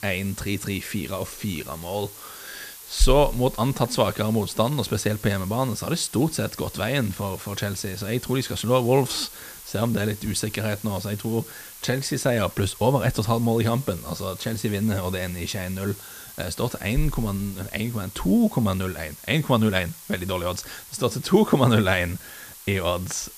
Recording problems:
hiss; noticeable; throughout; 15 dB below the speech

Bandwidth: 14.5 kHz